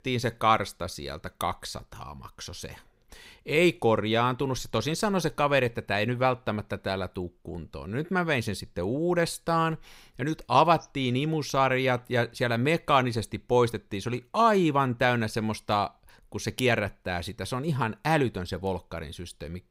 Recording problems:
none

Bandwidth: 15.5 kHz